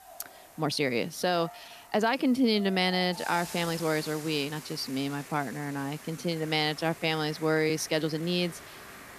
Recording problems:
hiss; noticeable; throughout; 20 dB below the speech
crowd noise; faint; throughout; 20 dB below the speech
uneven, jittery; strongly; from 0.5 to 8.5 s

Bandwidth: 14.5 kHz